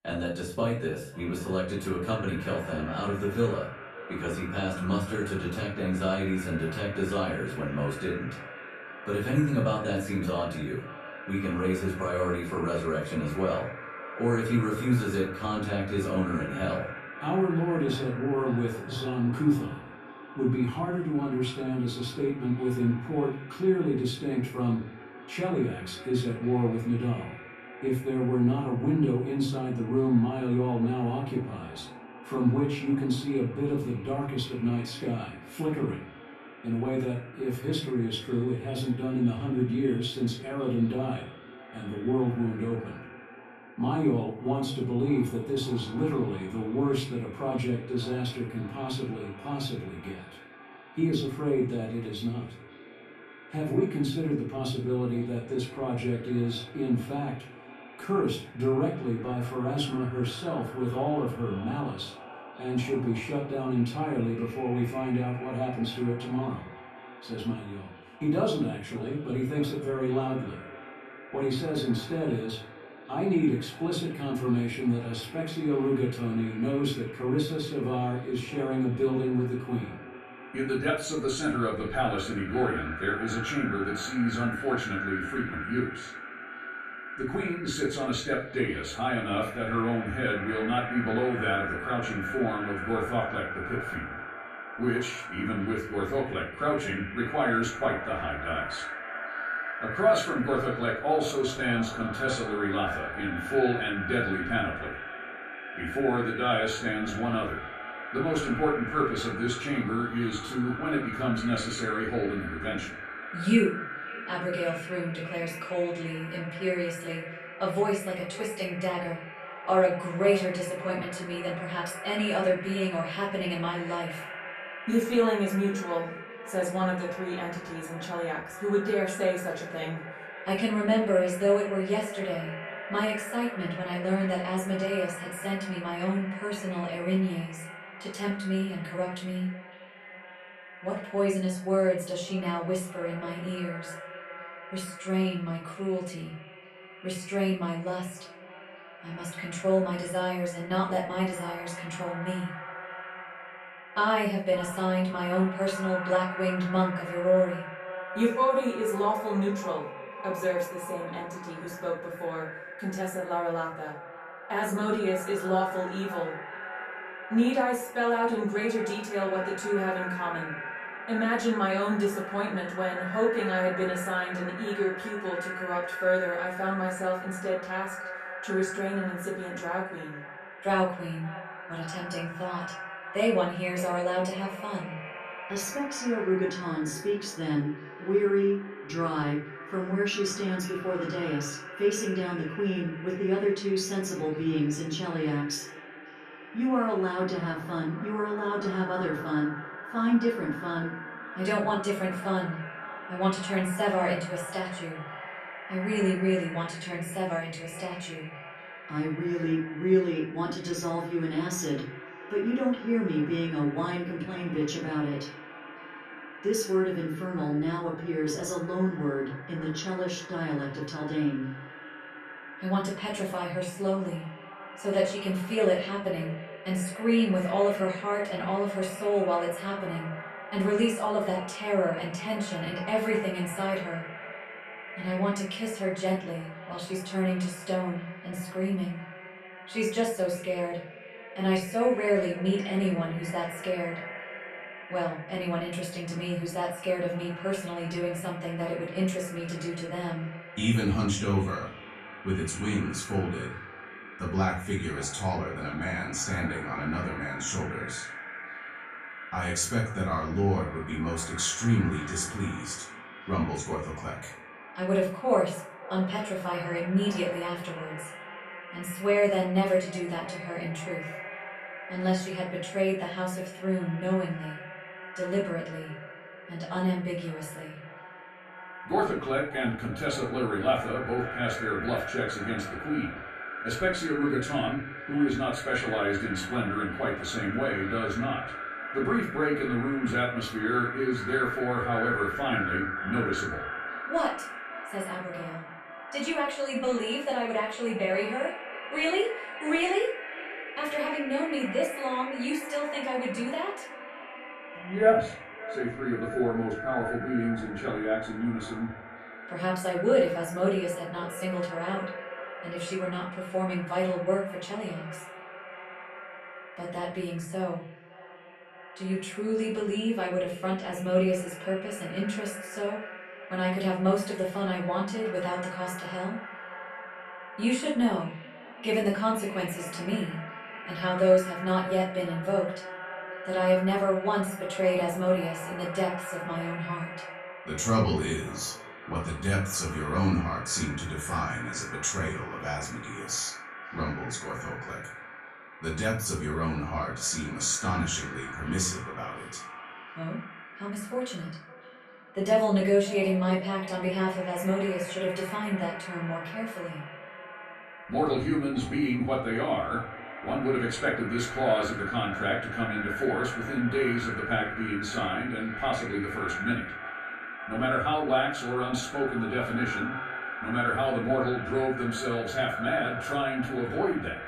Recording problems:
echo of what is said; strong; throughout; 550 ms later, 10 dB below the speech
off-mic speech; far
room echo; slight; dies away in 0.4 s

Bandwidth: 13.5 kHz